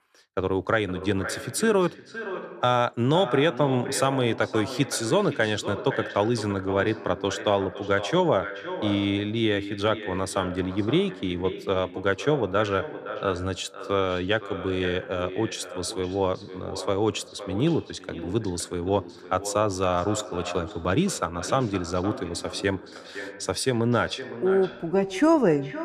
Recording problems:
echo of what is said; strong; throughout; 510 ms later, 10 dB below the speech

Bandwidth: 14.5 kHz